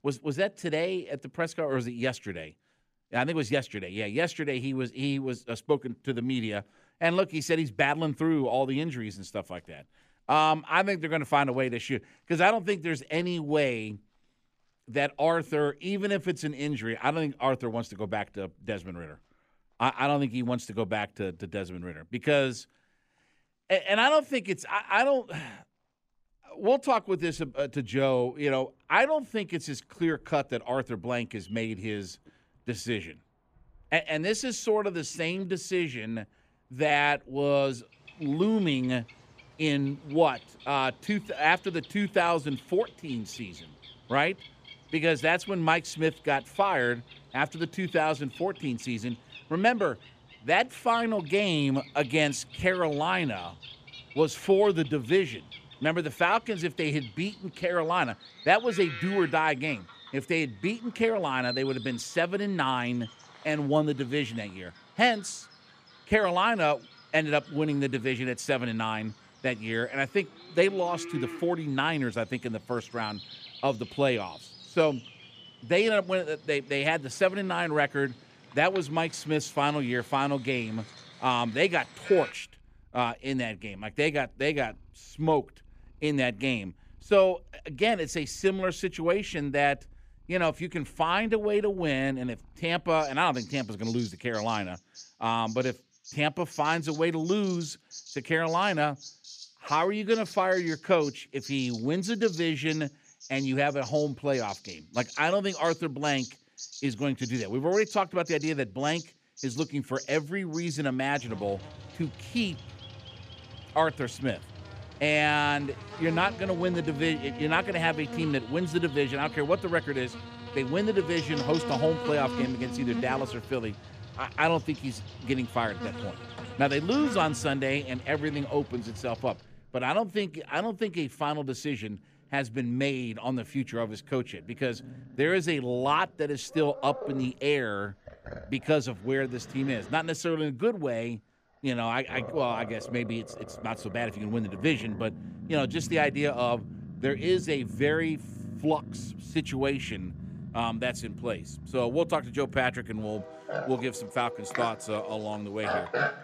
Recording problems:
animal sounds; noticeable; throughout; 15 dB below the speech

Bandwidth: 14.5 kHz